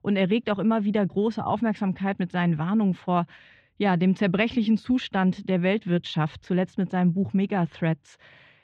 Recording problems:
muffled; very; fading above 3 kHz

